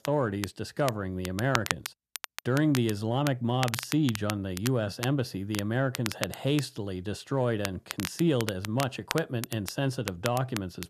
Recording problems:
crackle, like an old record; loud; 8 dB below the speech

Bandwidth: 14 kHz